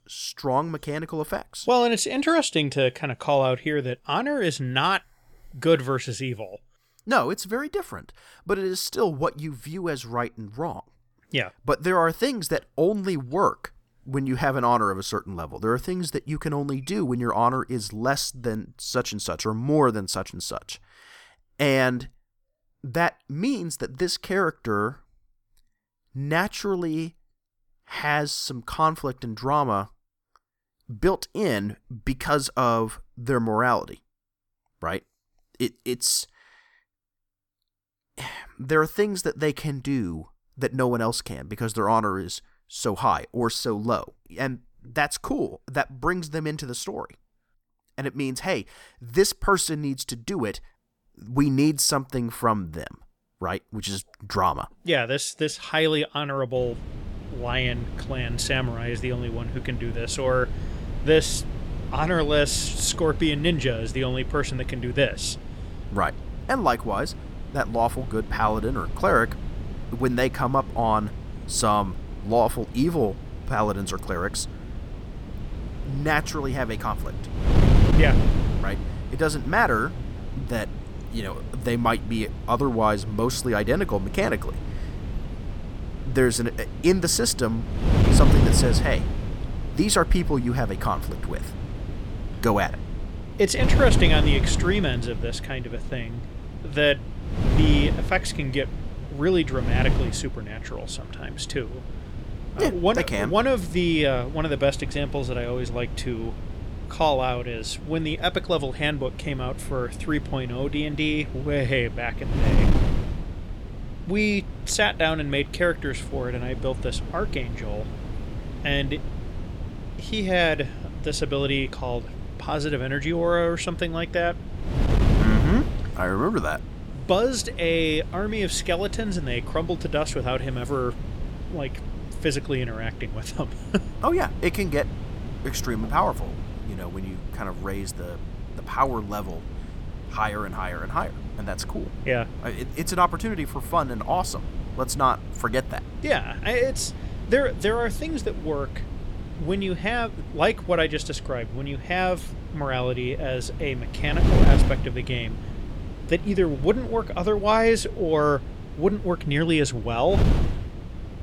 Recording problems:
wind noise on the microphone; occasional gusts; from 57 s on; 15 dB below the speech

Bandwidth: 18 kHz